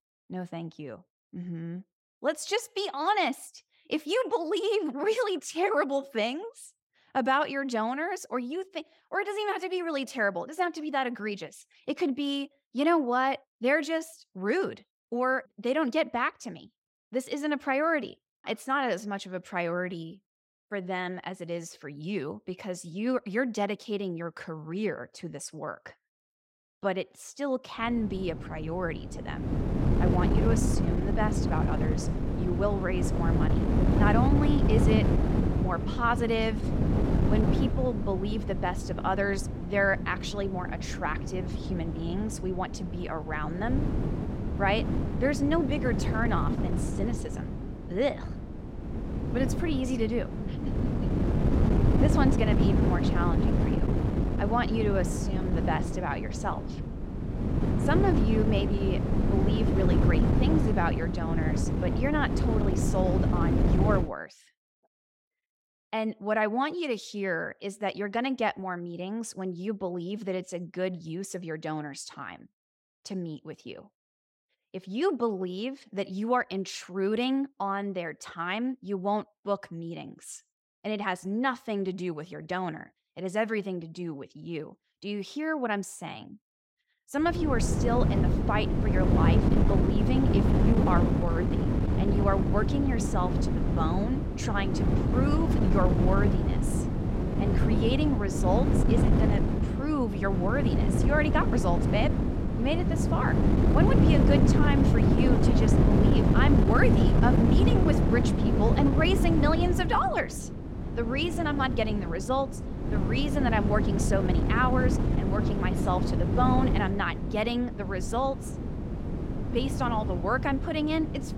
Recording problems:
wind noise on the microphone; heavy; from 28 s to 1:04 and from 1:27 on; 3 dB below the speech

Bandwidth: 16.5 kHz